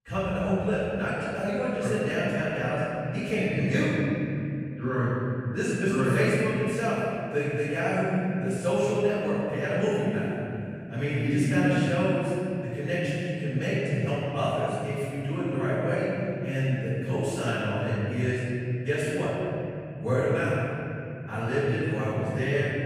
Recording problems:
room echo; strong; dies away in 3 s
off-mic speech; far

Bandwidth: 15 kHz